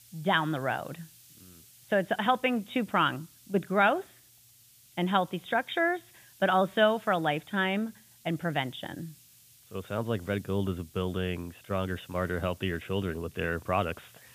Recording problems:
high frequencies cut off; severe; nothing above 4 kHz
hiss; faint; throughout; 25 dB below the speech

